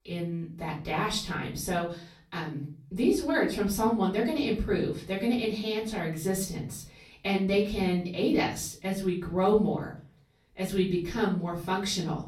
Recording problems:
off-mic speech; far
room echo; slight; dies away in 0.4 s

